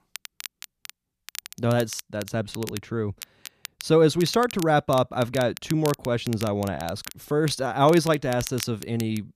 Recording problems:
crackle, like an old record; noticeable; 15 dB below the speech

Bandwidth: 14.5 kHz